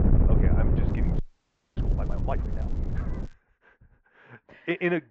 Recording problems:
muffled; very; fading above 2 kHz
high frequencies cut off; slight; nothing above 8 kHz
wind noise on the microphone; heavy; until 3.5 s; 4 dB below the speech
crackling; faint; from 1 to 3.5 s; 30 dB below the speech
audio freezing; at 1 s for 0.5 s

